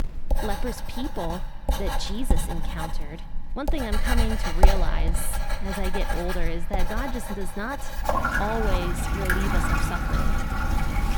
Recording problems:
household noises; very loud; throughout; 5 dB above the speech

